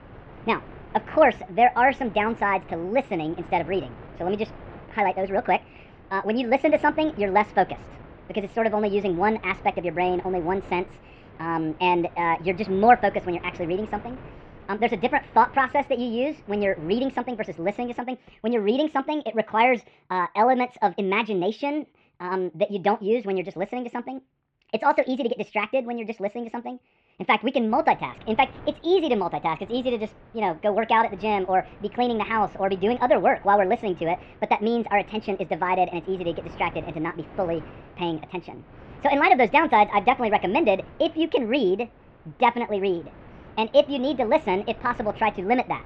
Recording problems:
muffled; very; fading above 3 kHz
wrong speed and pitch; too fast and too high; 1.5 times normal speed
wind noise on the microphone; occasional gusts; until 18 s and from 28 s on; 25 dB below the speech

